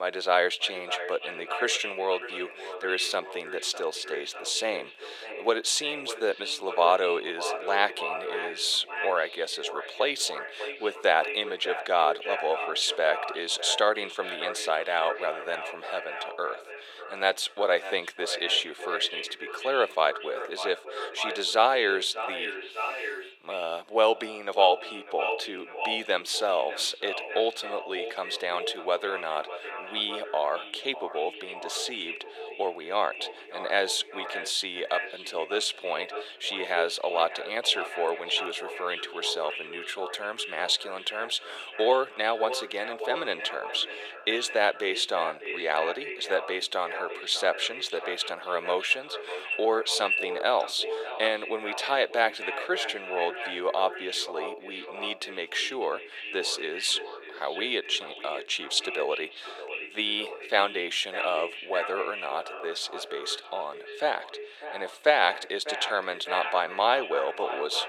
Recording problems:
echo of what is said; strong; throughout; 600 ms later, 8 dB below the speech
thin; very; fading below 450 Hz
abrupt cut into speech; at the start

